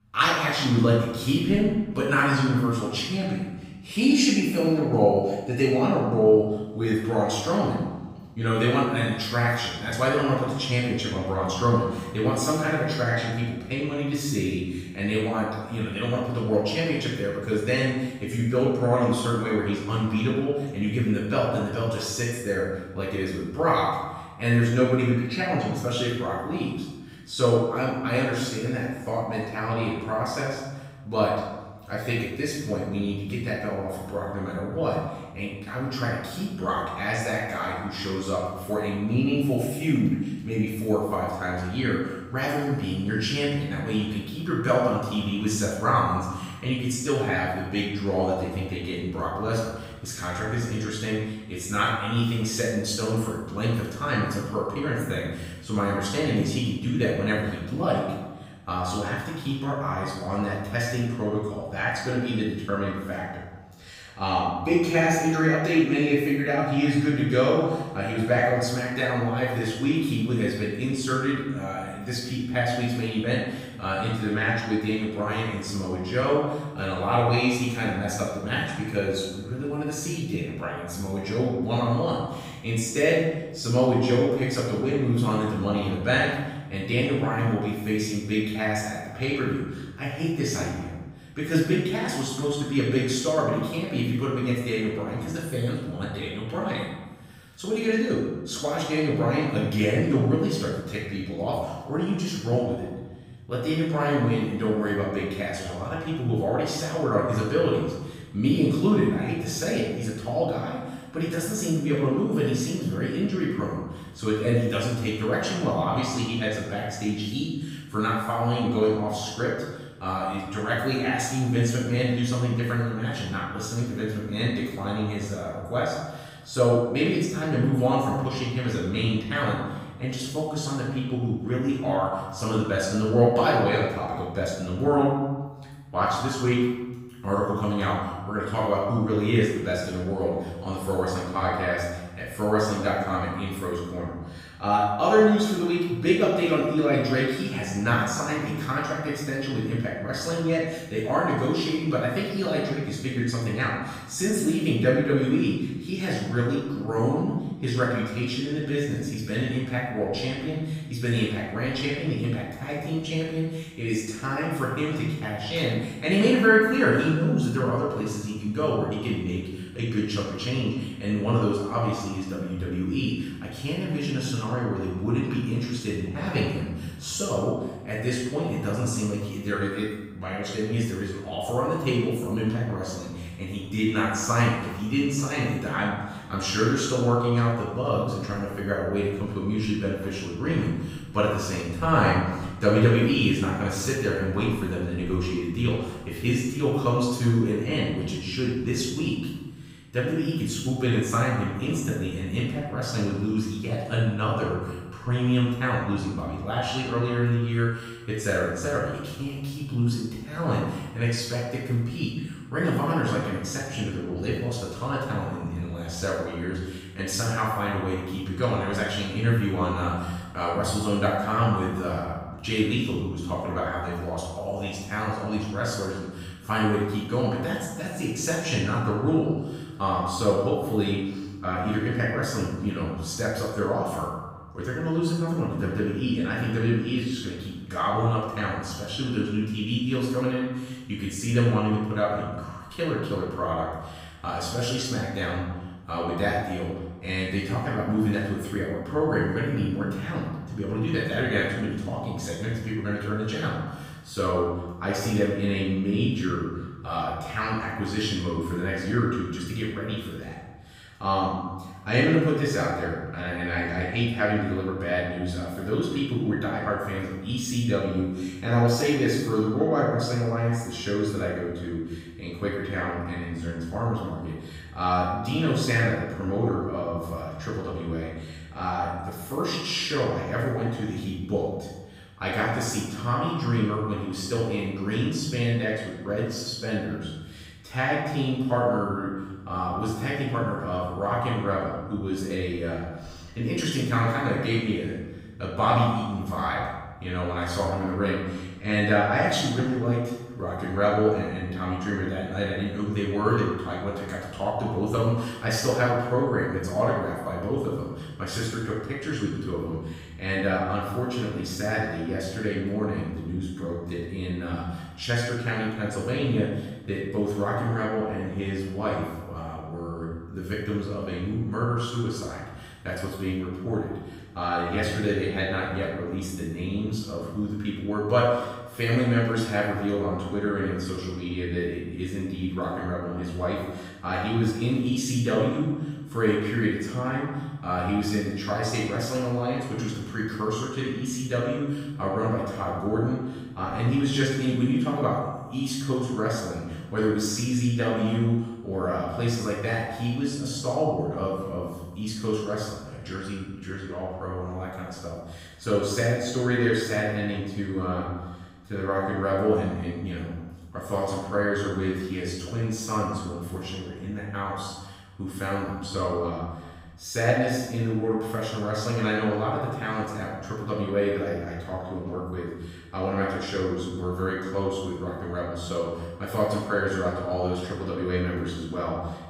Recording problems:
room echo; strong; dies away in 1.1 s
off-mic speech; far

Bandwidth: 15.5 kHz